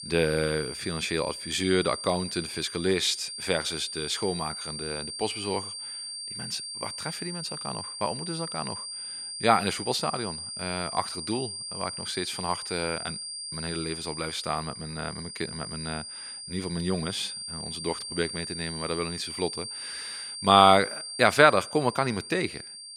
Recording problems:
thin; very slightly; fading below 450 Hz
high-pitched whine; loud; throughout; 4.5 kHz, 7 dB below the speech

